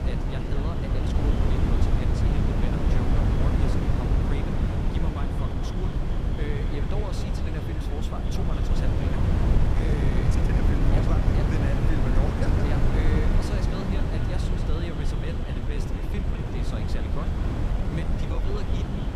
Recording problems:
echo of what is said; strong; throughout; 210 ms later, 10 dB below the speech
wind noise on the microphone; heavy; 5 dB above the speech
high-pitched whine; faint; from 6.5 s on; 7.5 kHz, 30 dB below the speech
murmuring crowd; very faint; throughout; 25 dB below the speech
uneven, jittery; strongly; from 1 to 19 s

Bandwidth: 14.5 kHz